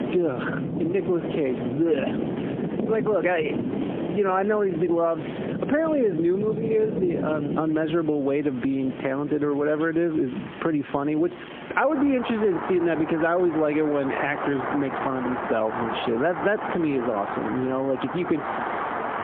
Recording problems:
phone-call audio; poor line; nothing above 3.5 kHz
squashed, flat; somewhat, background pumping
rain or running water; loud; throughout; 6 dB below the speech

